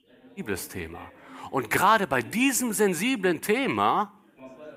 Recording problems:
chatter from many people; faint; throughout; 25 dB below the speech

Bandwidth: 15.5 kHz